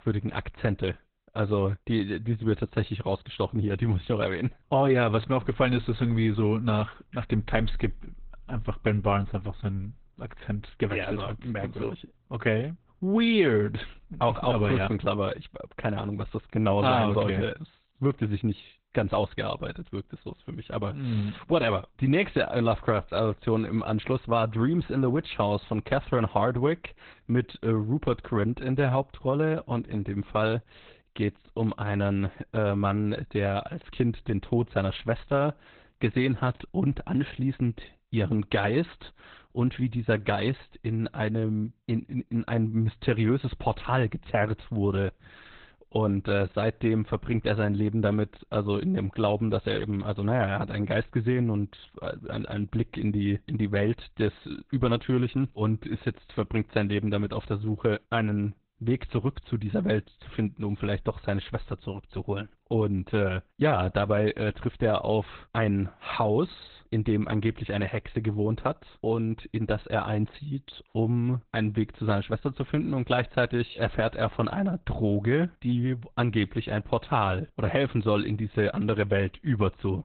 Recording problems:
garbled, watery; badly; nothing above 4 kHz

